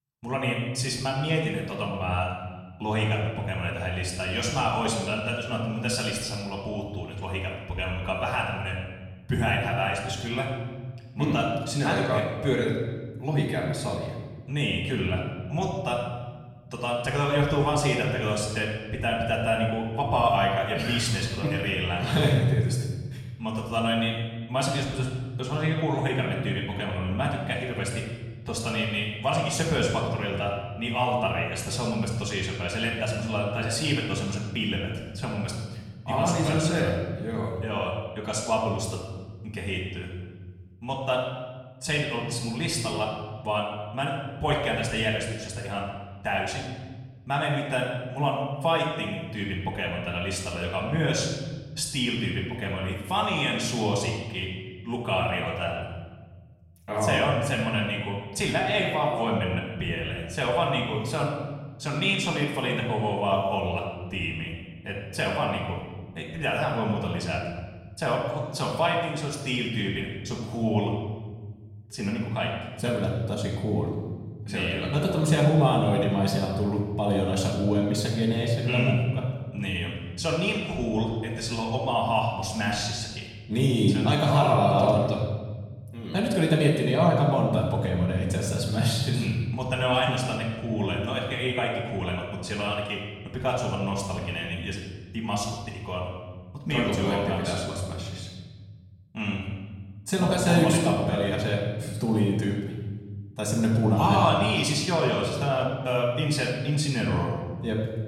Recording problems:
off-mic speech; far
room echo; noticeable; dies away in 1.5 s

